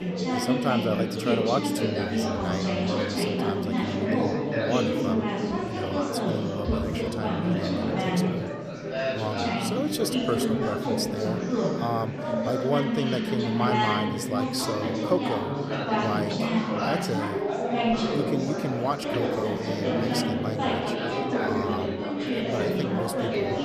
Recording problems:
chatter from many people; very loud; throughout; 5 dB above the speech

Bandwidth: 14.5 kHz